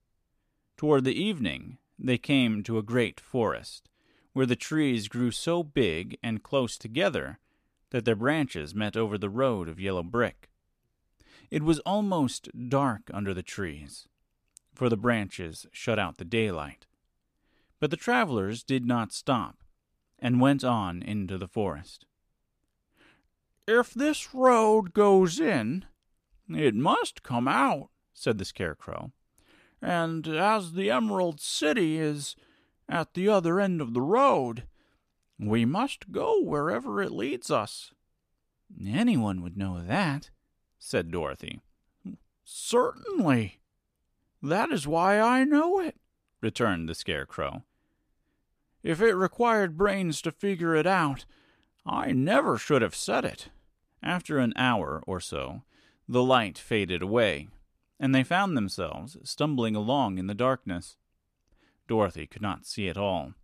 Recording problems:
none

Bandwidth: 14.5 kHz